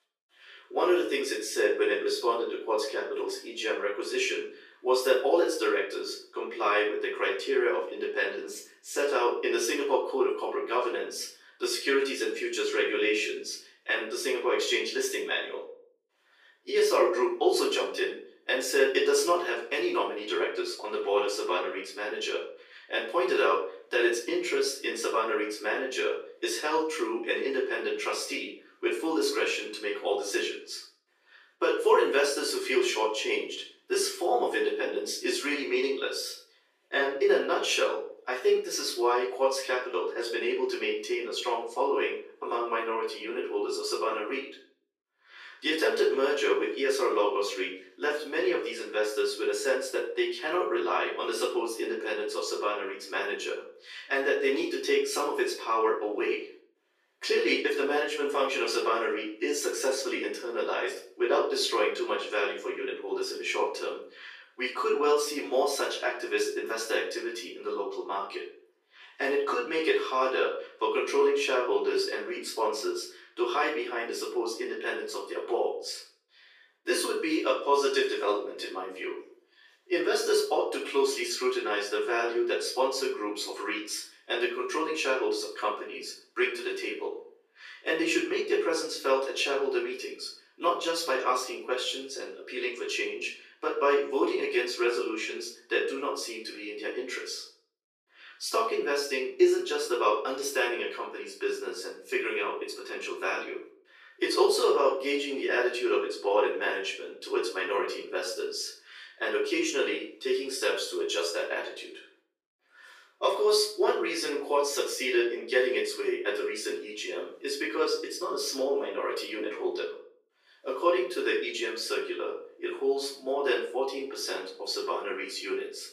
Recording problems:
off-mic speech; far
thin; very; fading below 350 Hz
room echo; noticeable; dies away in 0.4 s

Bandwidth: 15 kHz